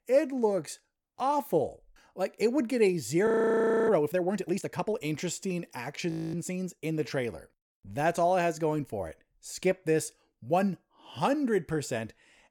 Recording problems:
audio freezing; at 3.5 s for 0.5 s and at 6 s

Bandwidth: 17.5 kHz